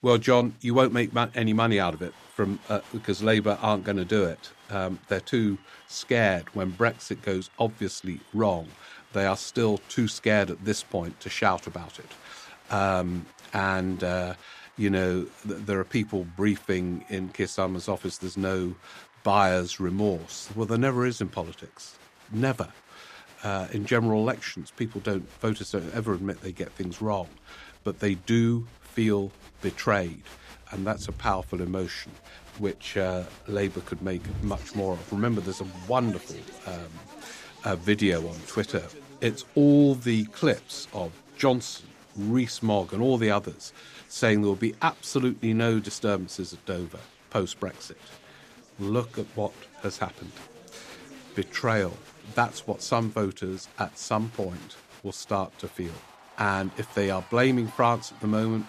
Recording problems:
crowd noise; faint; throughout; 20 dB below the speech

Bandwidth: 14.5 kHz